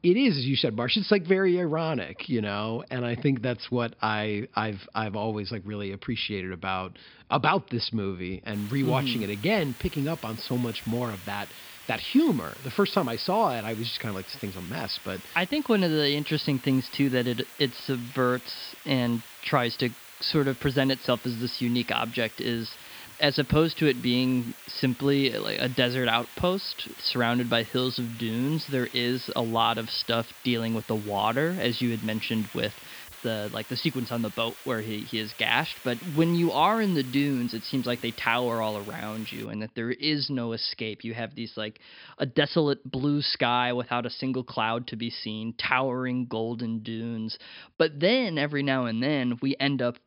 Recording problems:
high frequencies cut off; noticeable; nothing above 5.5 kHz
hiss; noticeable; from 8.5 to 39 s; 15 dB below the speech

